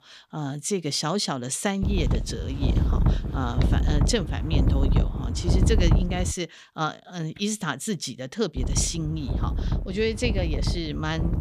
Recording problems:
wind noise on the microphone; heavy; from 2 to 6.5 s and from 8.5 s on; 6 dB below the speech

